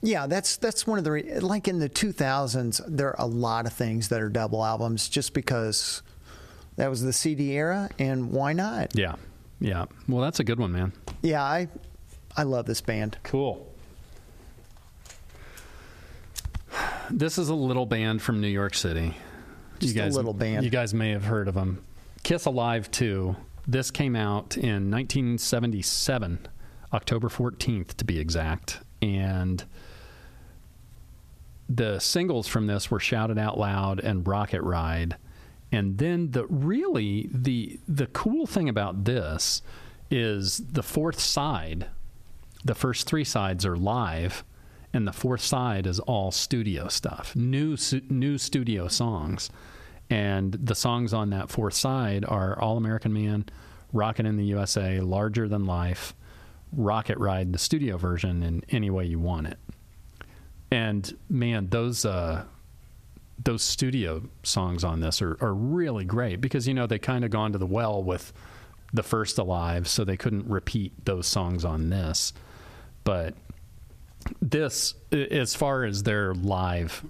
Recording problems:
squashed, flat; heavily

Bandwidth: 14.5 kHz